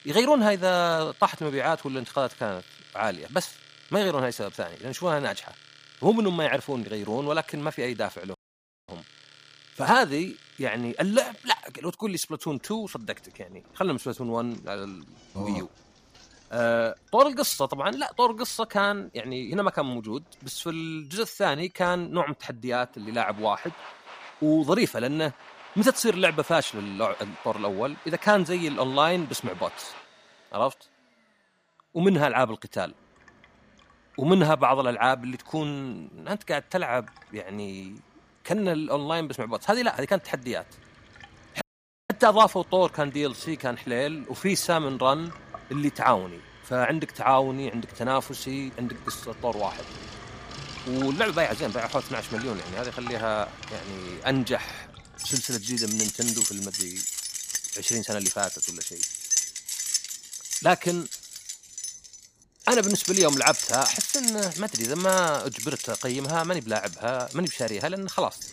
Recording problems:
household noises; loud; throughout; 4 dB below the speech
audio cutting out; at 8.5 s for 0.5 s and at 42 s

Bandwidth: 15 kHz